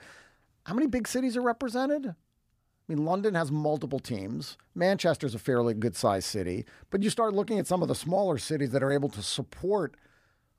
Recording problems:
none

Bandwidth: 15 kHz